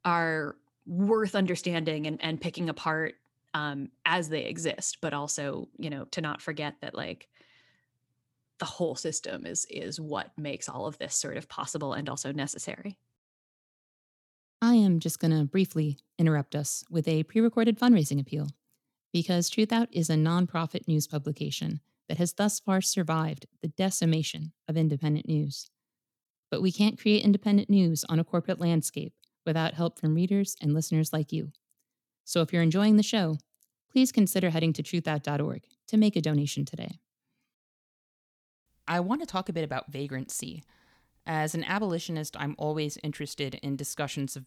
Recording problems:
none

